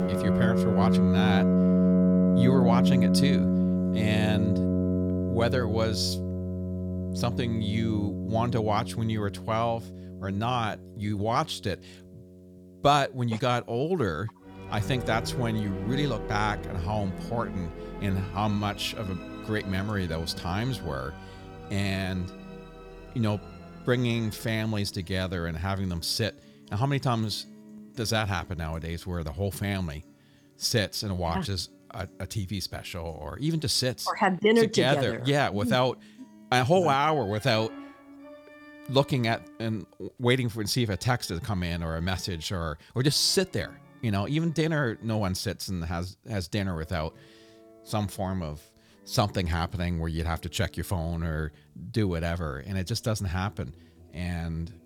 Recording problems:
background music; very loud; throughout; as loud as the speech

